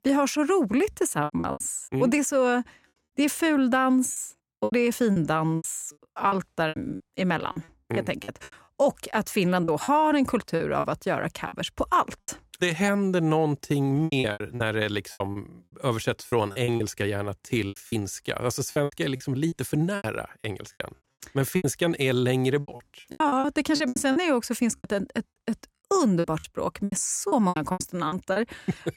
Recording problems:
choppy; very; 13% of the speech affected

